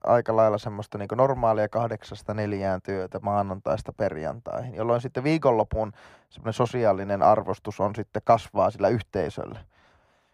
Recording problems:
muffled; very; fading above 2.5 kHz

